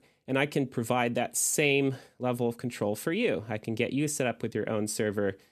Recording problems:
none

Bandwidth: 14 kHz